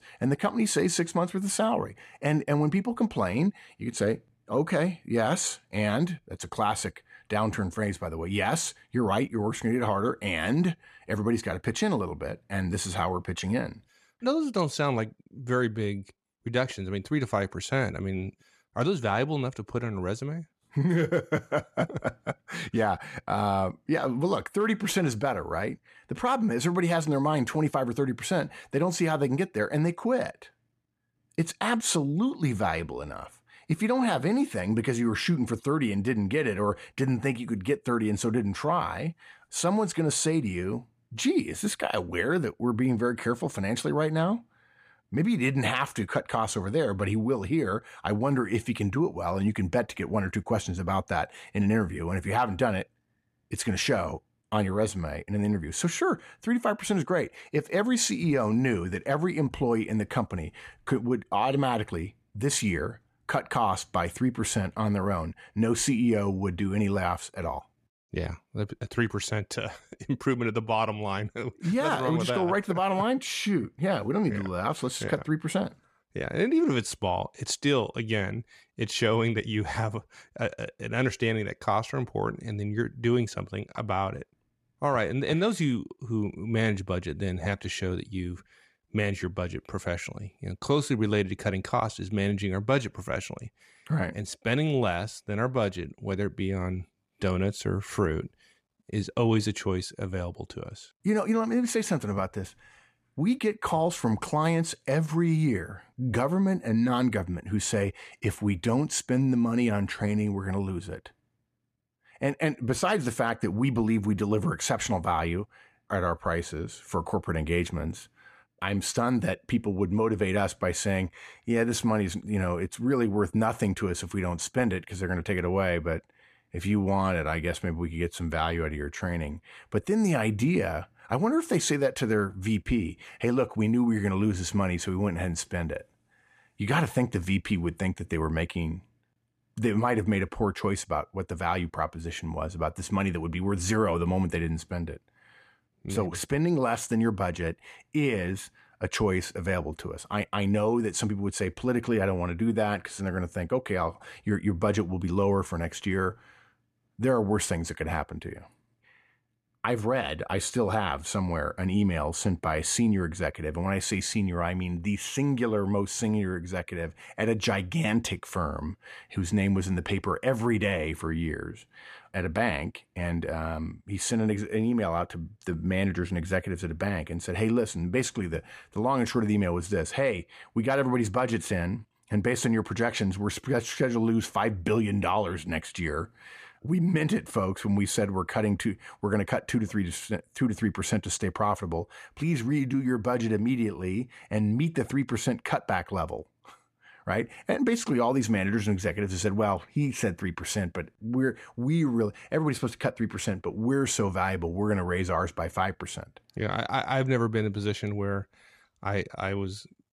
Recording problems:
none

